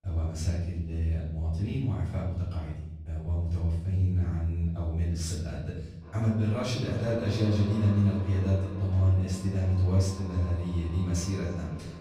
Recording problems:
off-mic speech; far
echo of what is said; noticeable; from 6 s on; 300 ms later, 15 dB below the speech
room echo; noticeable; dies away in 0.9 s

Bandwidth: 15 kHz